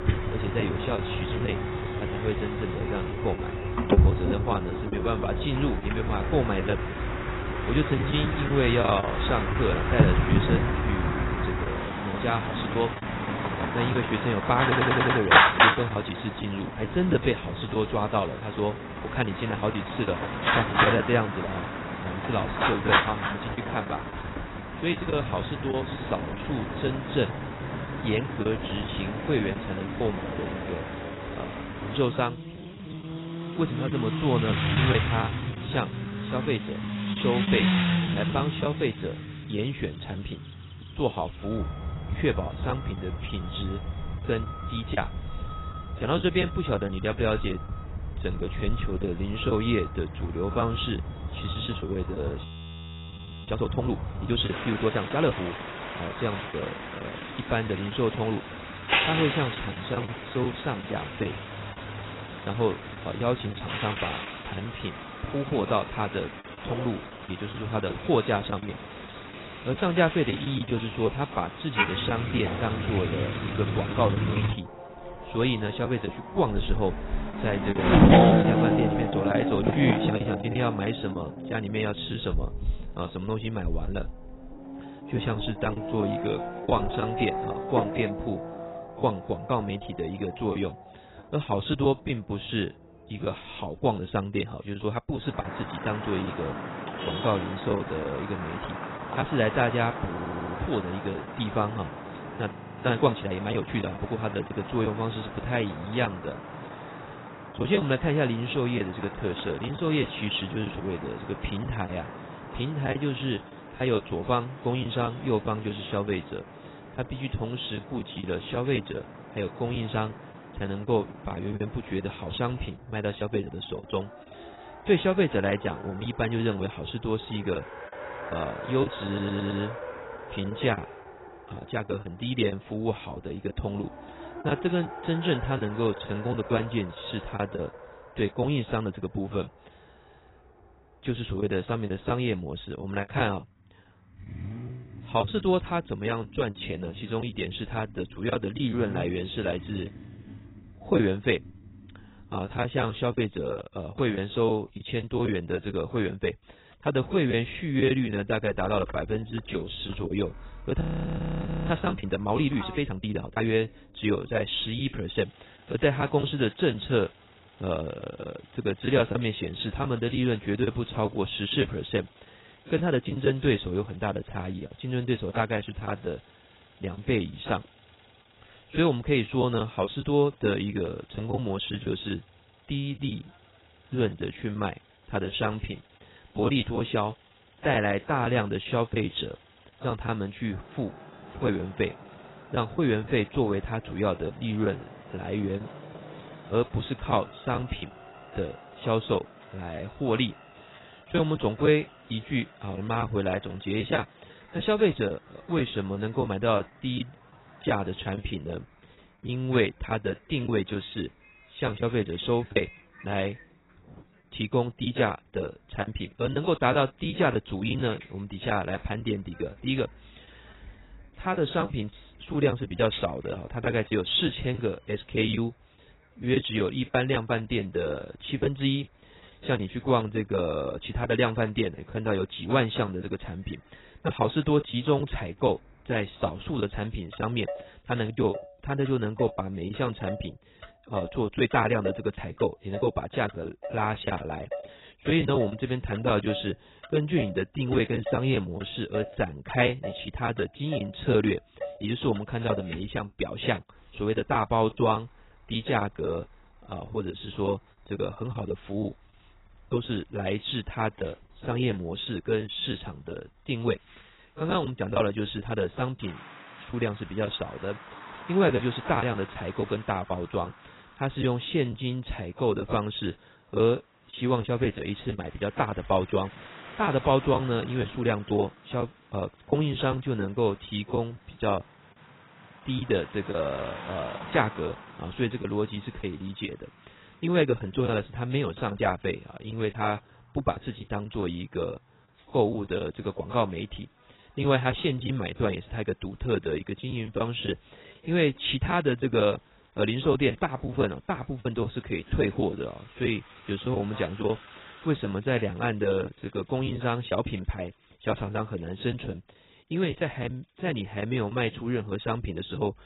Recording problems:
garbled, watery; badly; nothing above 4 kHz
traffic noise; loud; throughout; 2 dB below the speech
choppy; very; 6% of the speech affected
audio stuttering; at 15 s, at 1:40 and at 2:09
audio freezing; at 52 s for 1 s, at 1:43 and at 2:41 for 1 s

